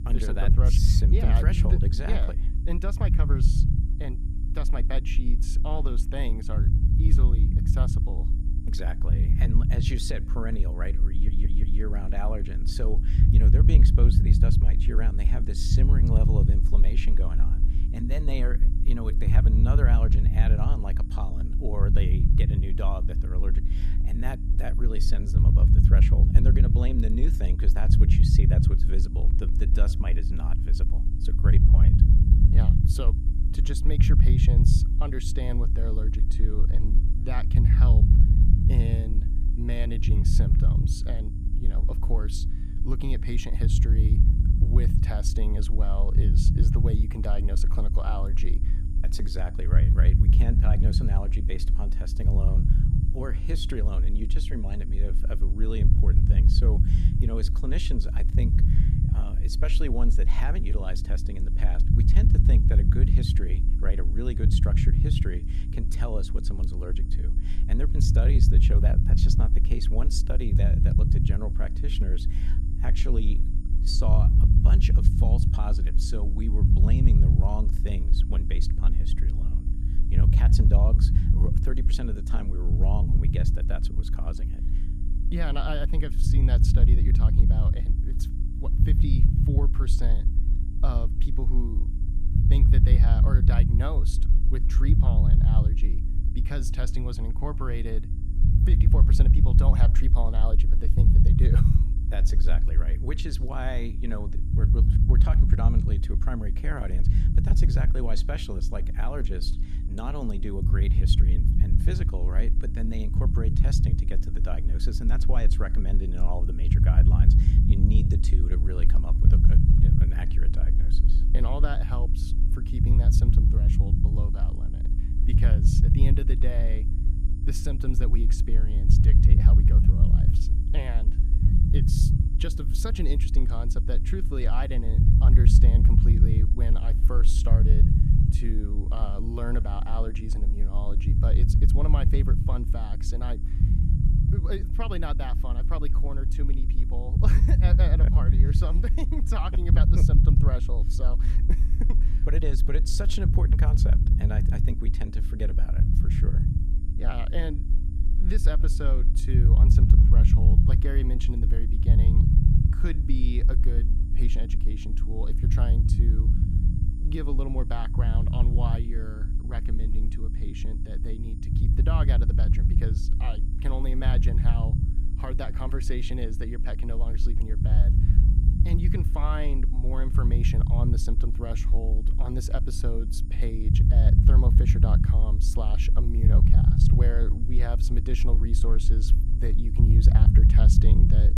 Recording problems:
low rumble; loud; throughout; 1 dB below the speech
electrical hum; noticeable; throughout; 60 Hz, 10 dB below the speech
high-pitched whine; faint; throughout; 9 kHz, 30 dB below the speech
audio stuttering; at 11 s

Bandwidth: 15 kHz